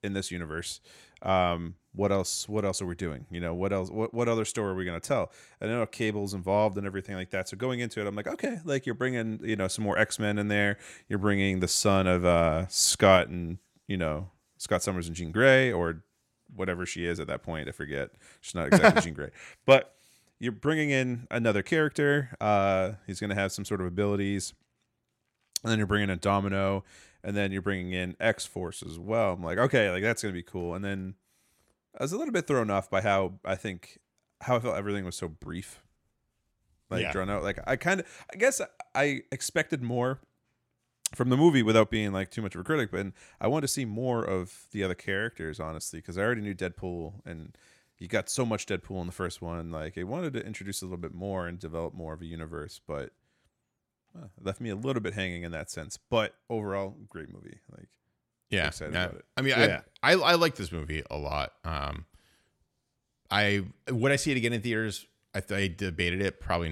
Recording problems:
abrupt cut into speech; at the end

